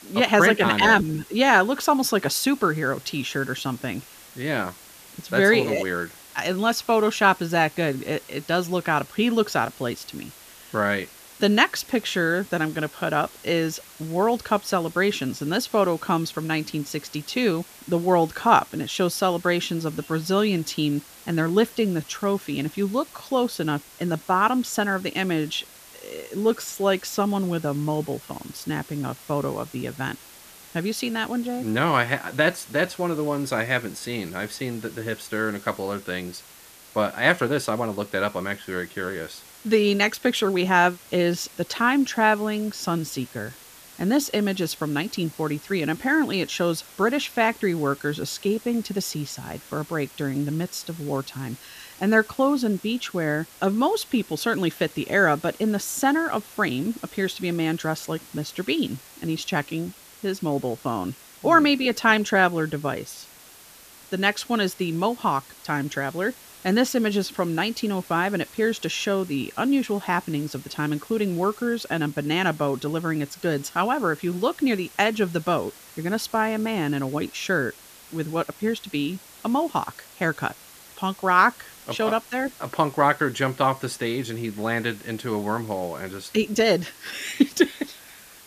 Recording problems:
hiss; faint; throughout; 20 dB below the speech

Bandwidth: 14.5 kHz